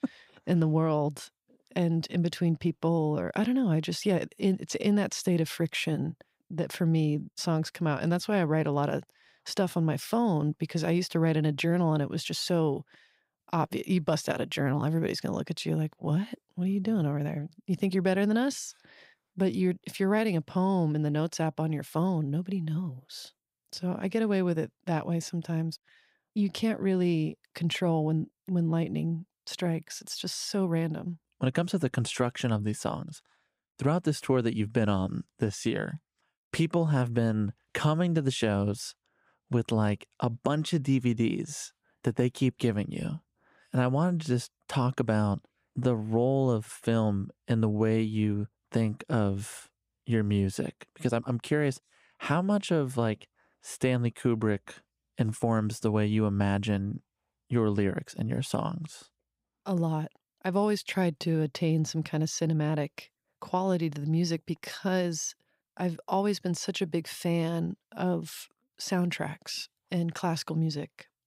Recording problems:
none

